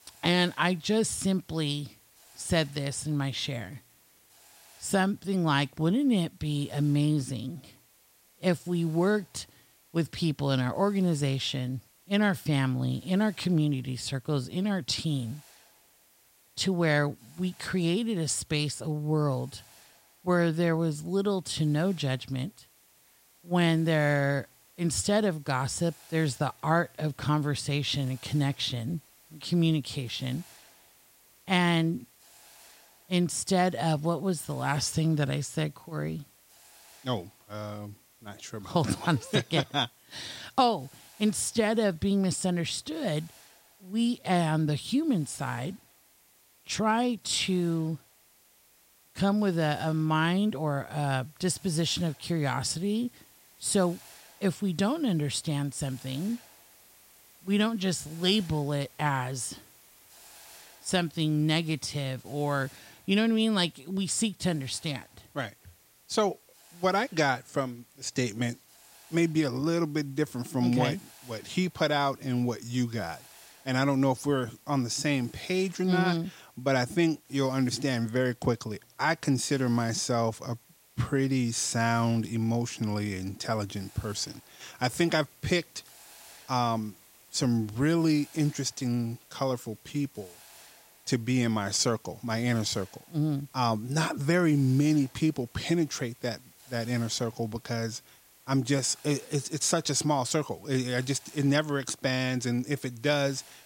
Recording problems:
hiss; faint; throughout; 25 dB below the speech

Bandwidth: 16 kHz